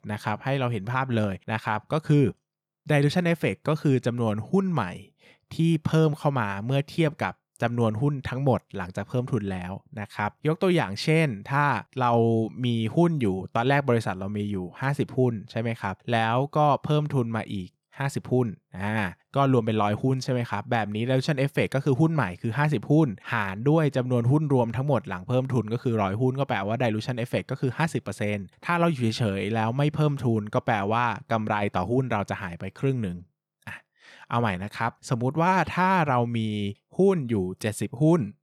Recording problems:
none

